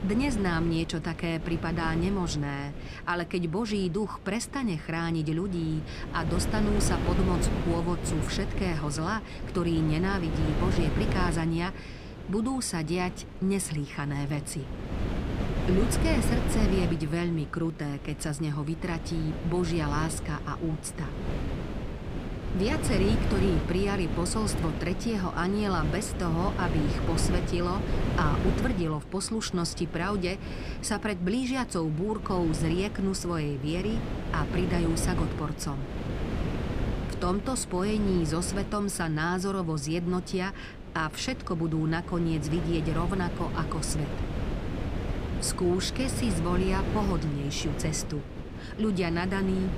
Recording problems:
wind noise on the microphone; heavy; 6 dB below the speech

